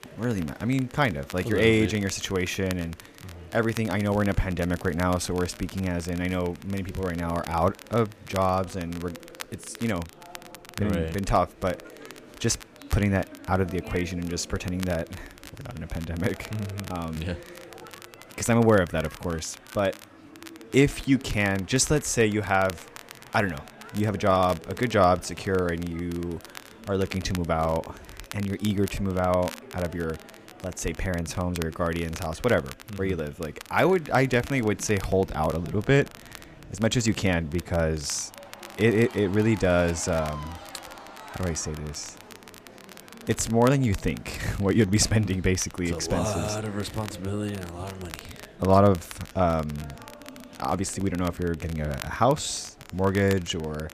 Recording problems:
crackle, like an old record; noticeable; 20 dB below the speech
murmuring crowd; faint; throughout; 20 dB below the speech

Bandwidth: 14.5 kHz